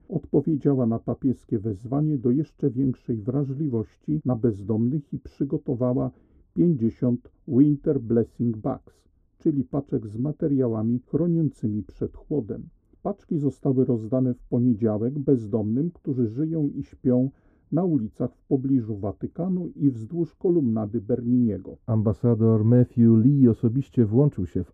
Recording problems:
muffled; very; fading above 1 kHz

